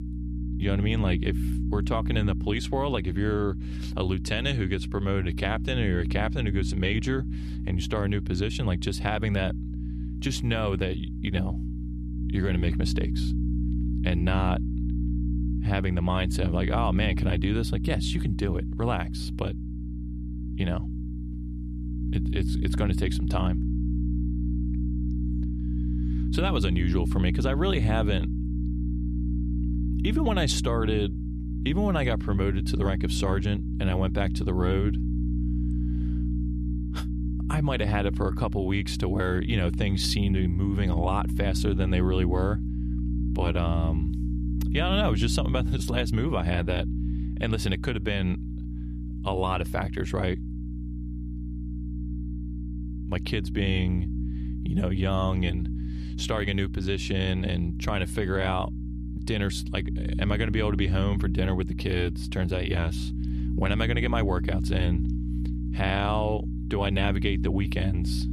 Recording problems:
electrical hum; loud; throughout; 60 Hz, 10 dB below the speech

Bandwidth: 14 kHz